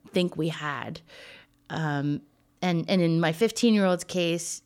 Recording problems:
none

